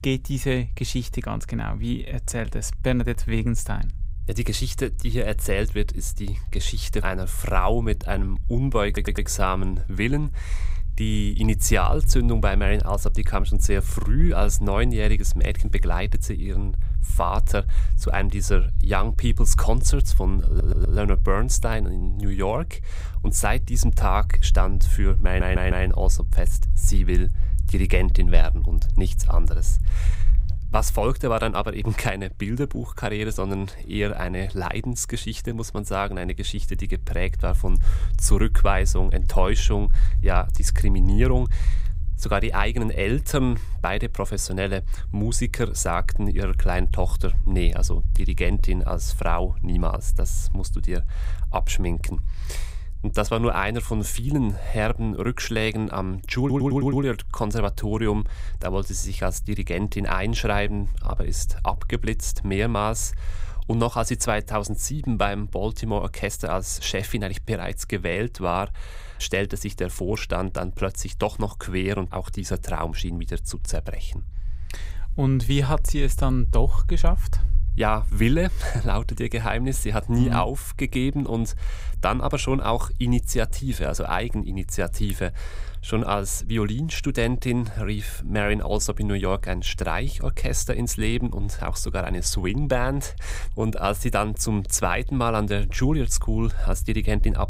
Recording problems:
low rumble; faint; throughout; 20 dB below the speech
audio stuttering; 4 times, first at 9 s

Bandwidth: 15.5 kHz